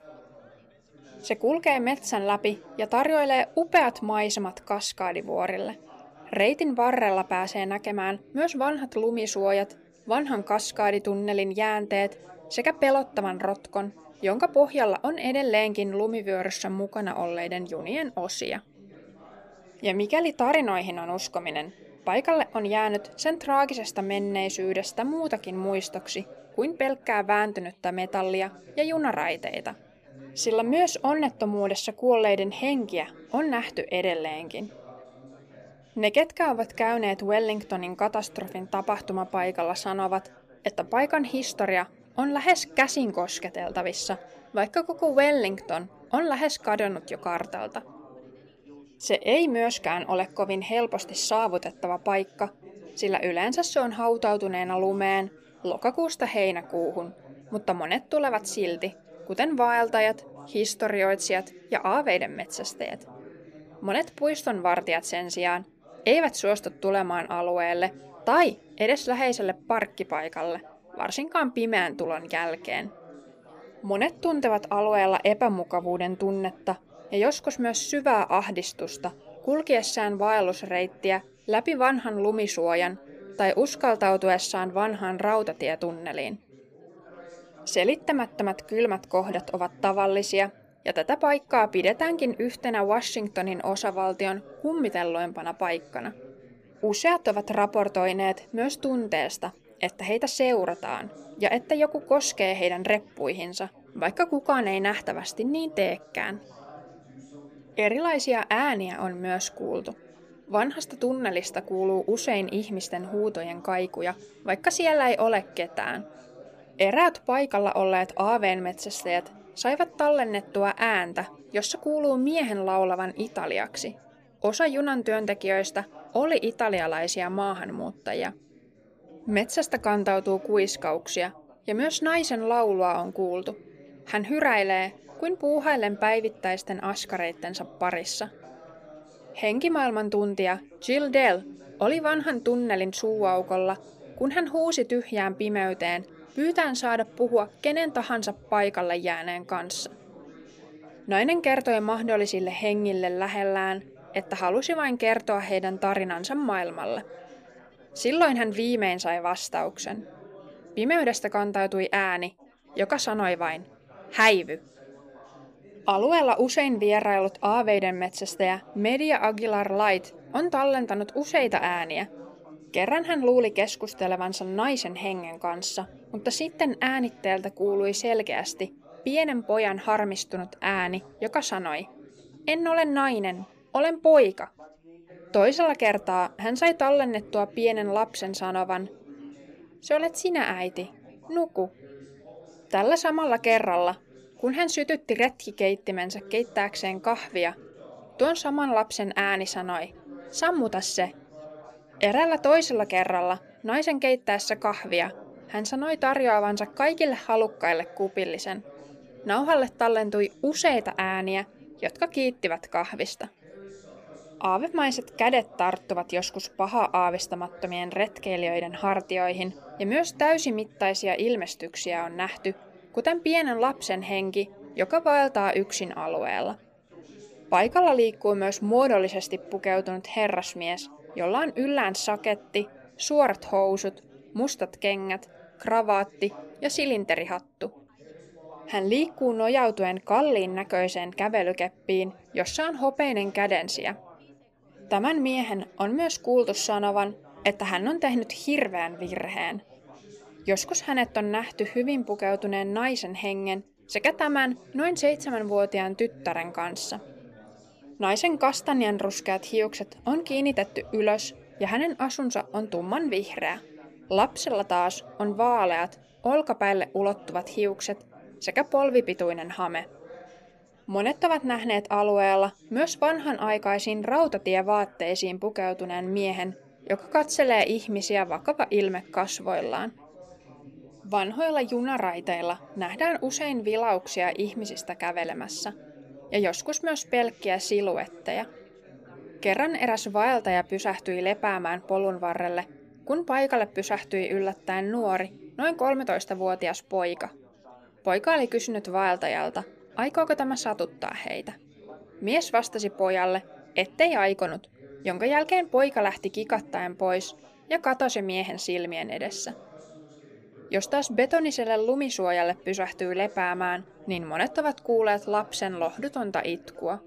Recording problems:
background chatter; faint; throughout; 4 voices, 25 dB below the speech

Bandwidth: 15 kHz